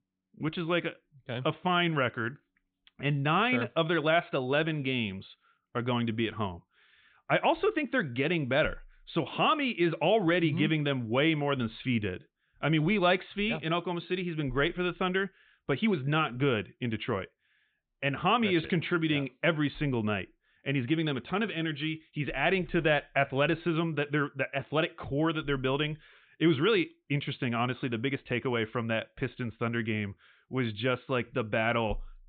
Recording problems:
high frequencies cut off; severe; nothing above 4 kHz

